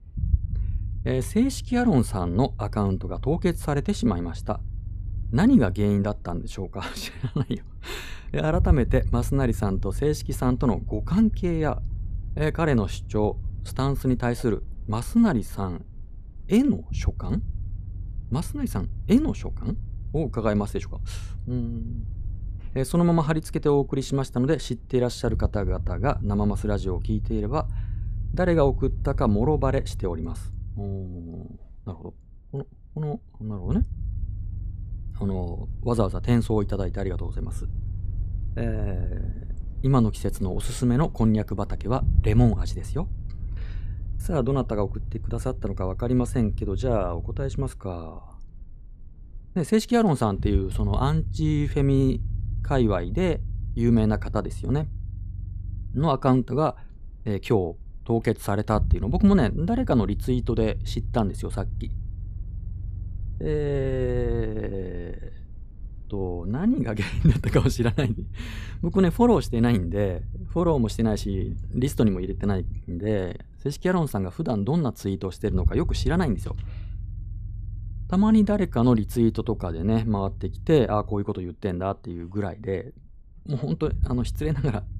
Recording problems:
low rumble; faint; throughout; 20 dB below the speech

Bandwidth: 14.5 kHz